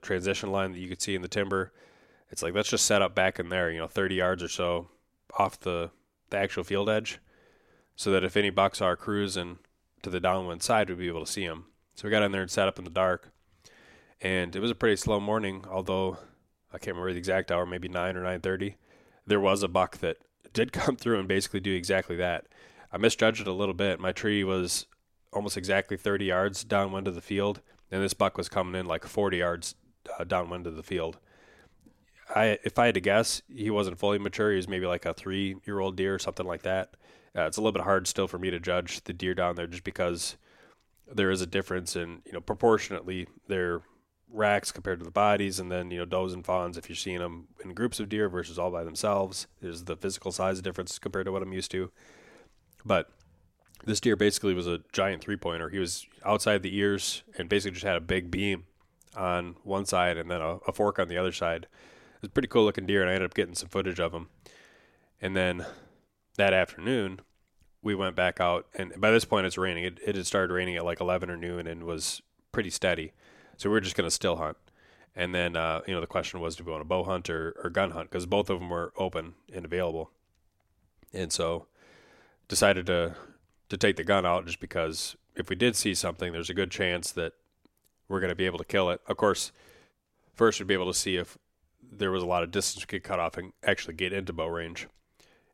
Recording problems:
none

